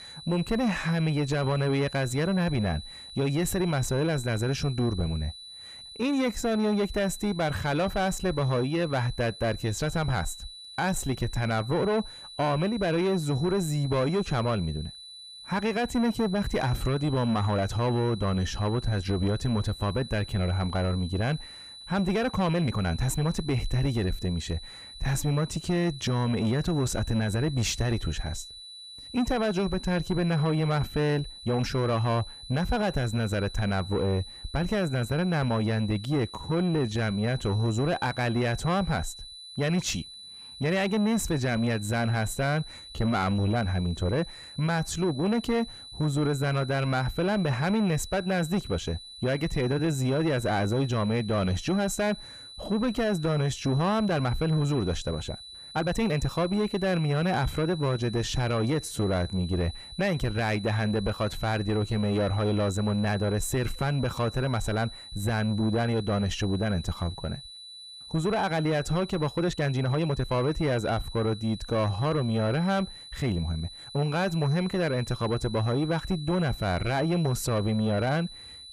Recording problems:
distortion; slight; 10 dB below the speech
high-pitched whine; noticeable; throughout; 4 kHz, 15 dB below the speech
uneven, jittery; strongly; from 6 s to 1:14

